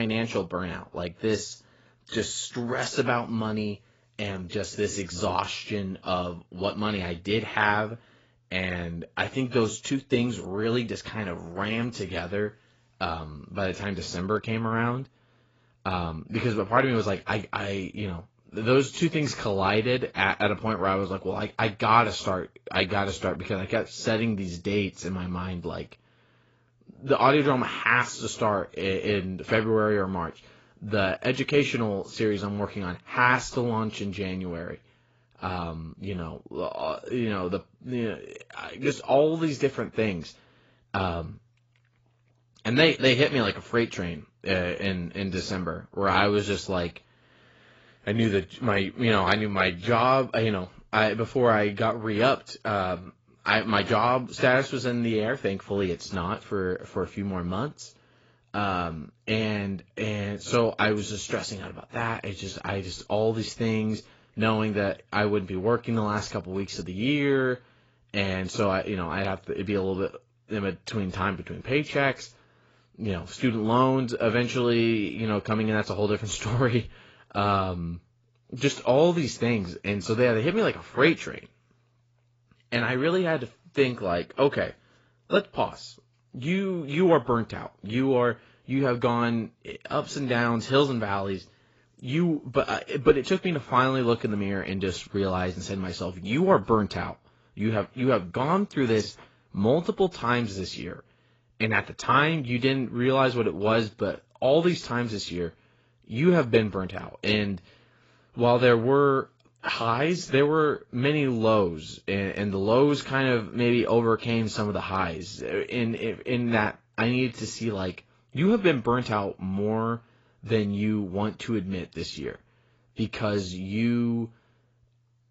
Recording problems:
garbled, watery; badly; nothing above 7.5 kHz
abrupt cut into speech; at the start

